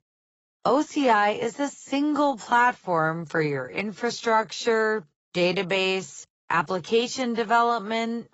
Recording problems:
garbled, watery; badly; nothing above 7.5 kHz
wrong speed, natural pitch; too slow; 0.6 times normal speed

